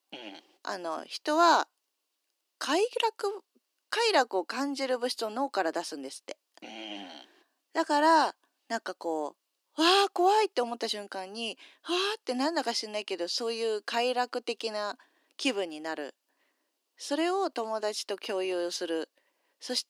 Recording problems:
thin; somewhat; fading below 300 Hz

